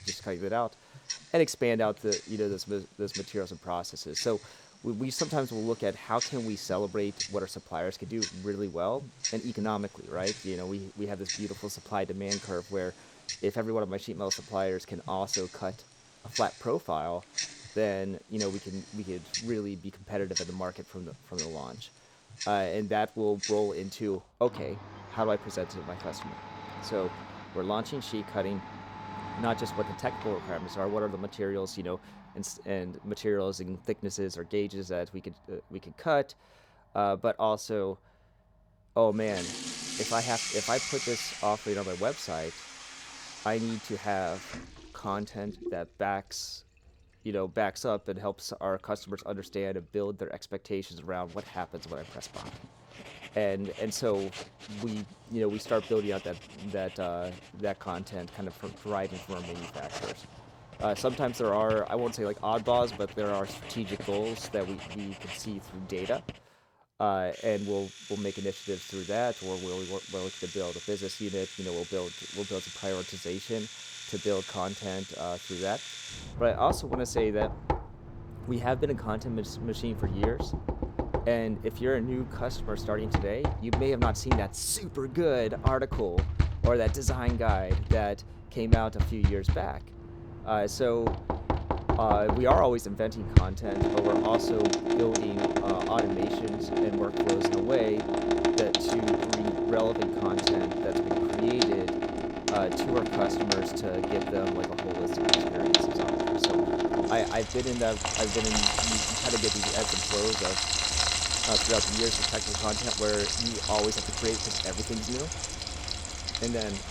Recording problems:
household noises; very loud; throughout; 1 dB above the speech

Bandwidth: 19 kHz